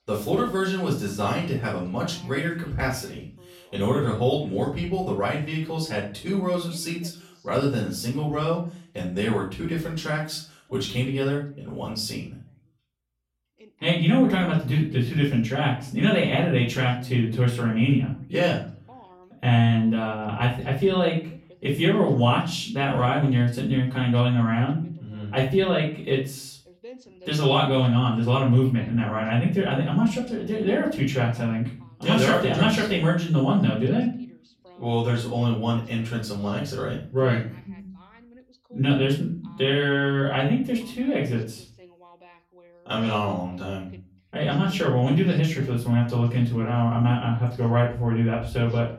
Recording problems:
off-mic speech; far
room echo; slight; dies away in 0.4 s
voice in the background; faint; throughout; 30 dB below the speech

